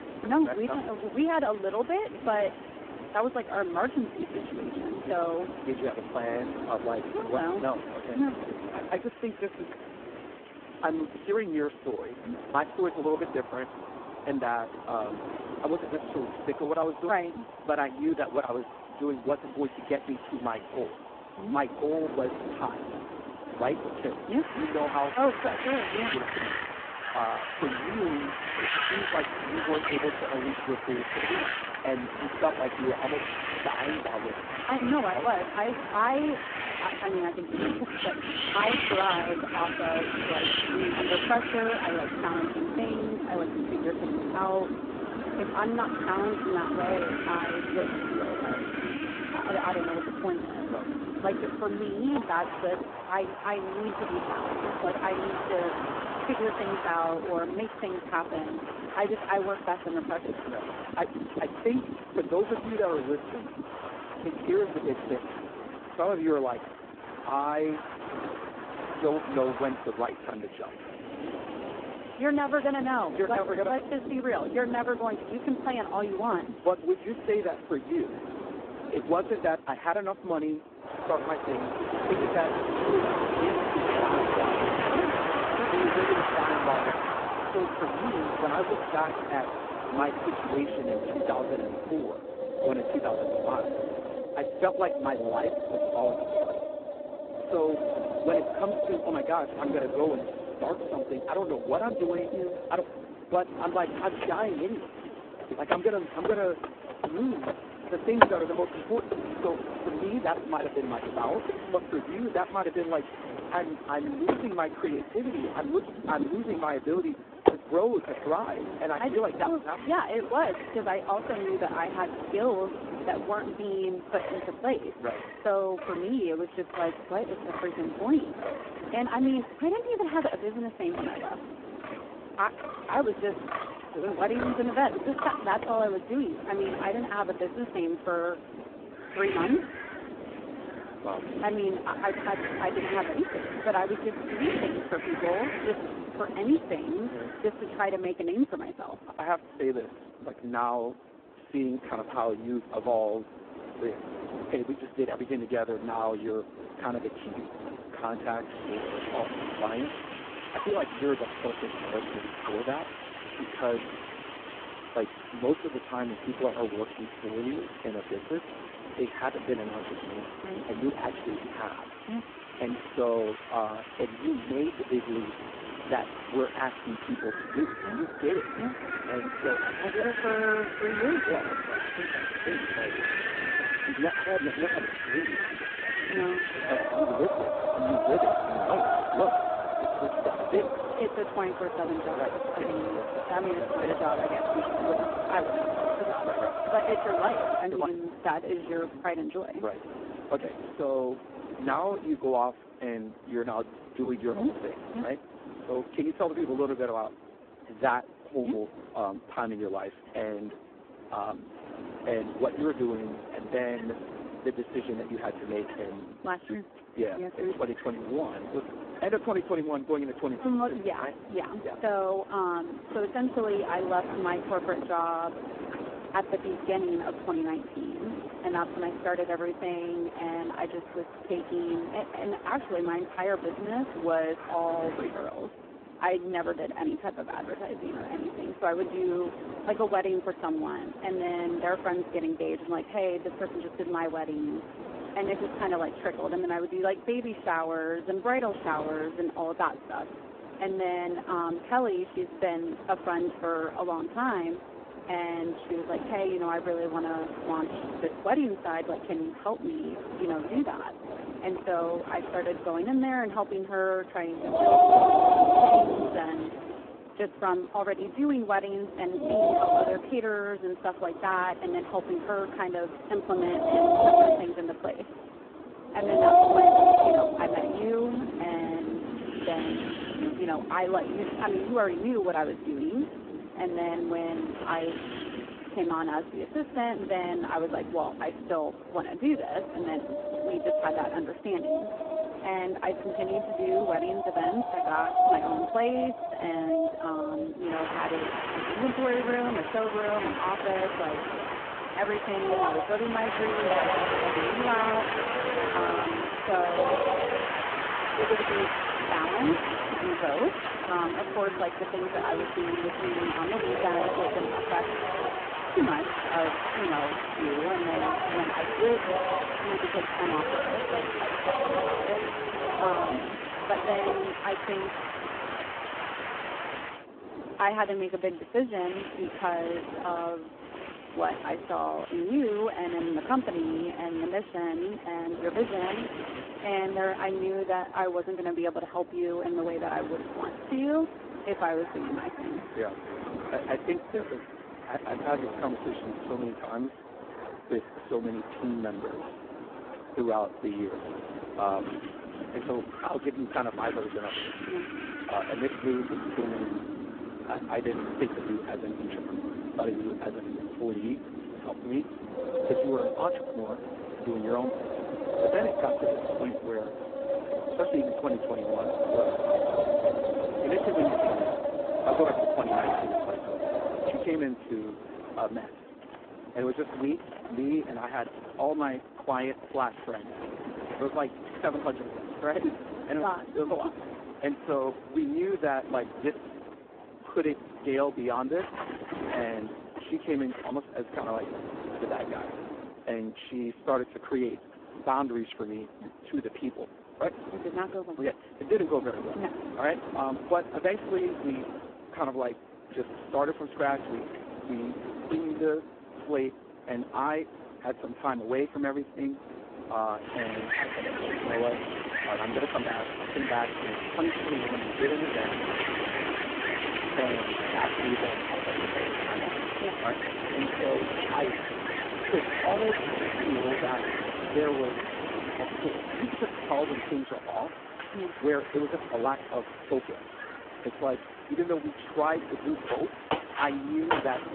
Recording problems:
phone-call audio; poor line
wind in the background; loud; throughout; 1 dB below the speech

